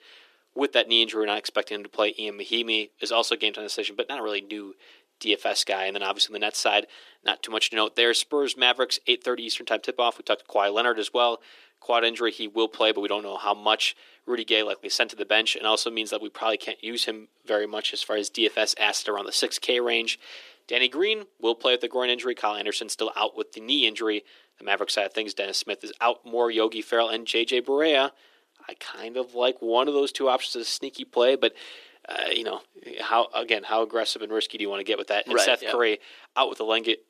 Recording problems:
thin; very; fading below 300 Hz

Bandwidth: 14.5 kHz